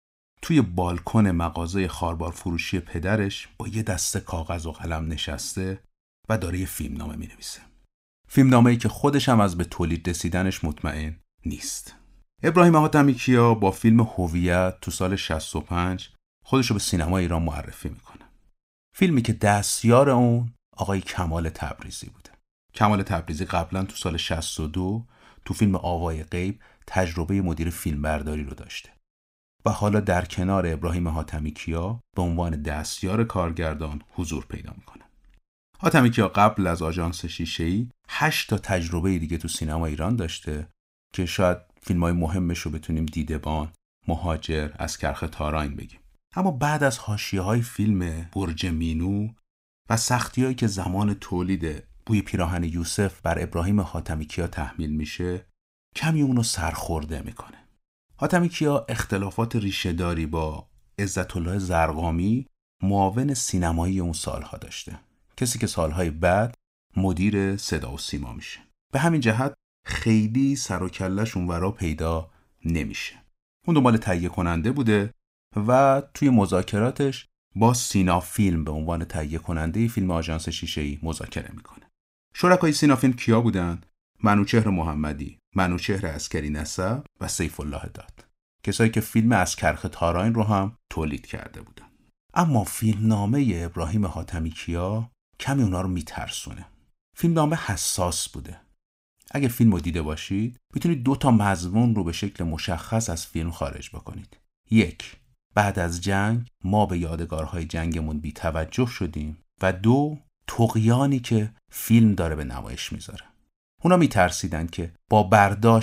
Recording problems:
abrupt cut into speech; at the end

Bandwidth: 15.5 kHz